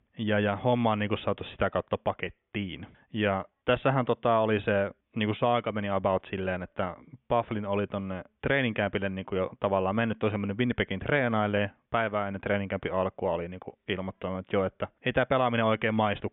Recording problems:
high frequencies cut off; severe; nothing above 3.5 kHz

